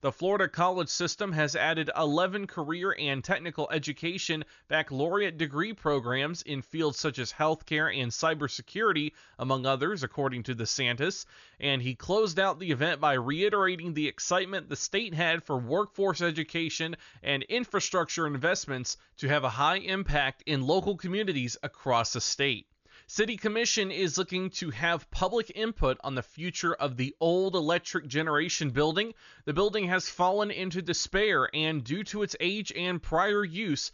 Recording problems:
high frequencies cut off; noticeable; nothing above 7 kHz

